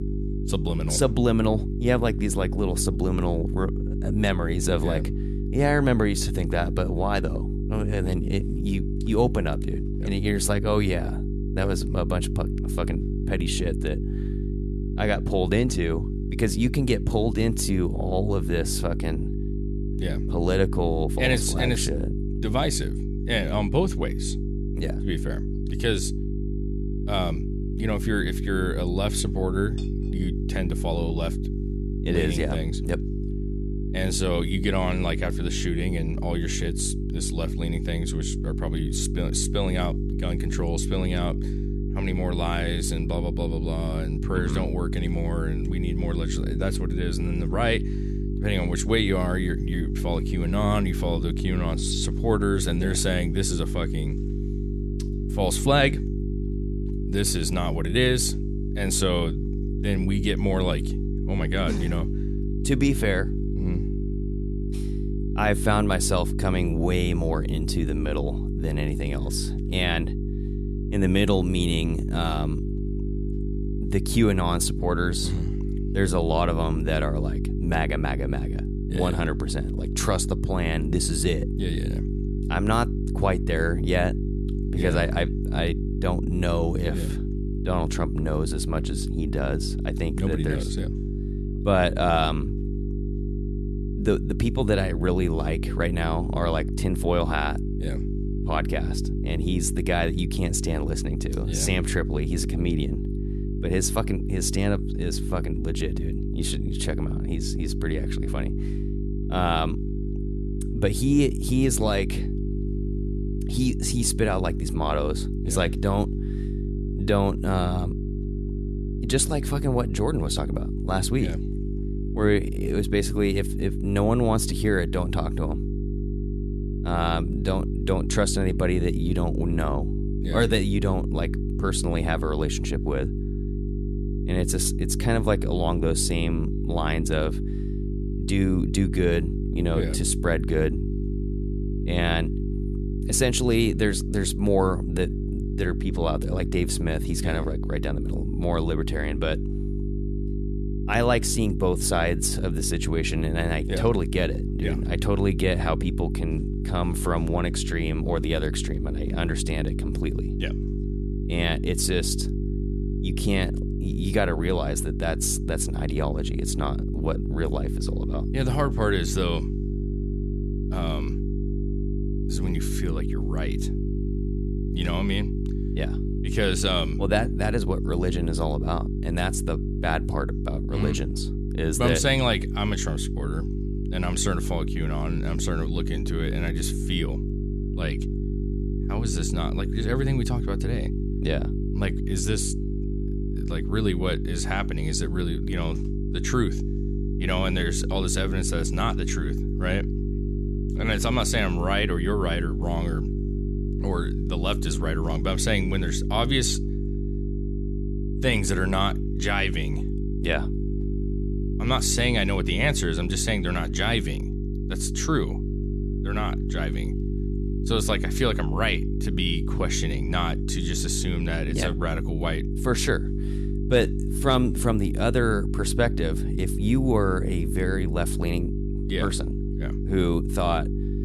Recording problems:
electrical hum; loud; throughout; 50 Hz, 9 dB below the speech

